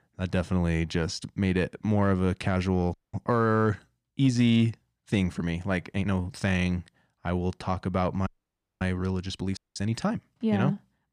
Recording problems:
uneven, jittery; strongly; from 2 to 10 s
audio cutting out; at 3 s, at 8.5 s for 0.5 s and at 9.5 s

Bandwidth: 14.5 kHz